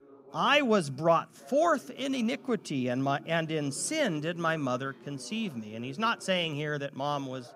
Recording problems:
voice in the background; faint; throughout; 20 dB below the speech

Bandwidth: 15.5 kHz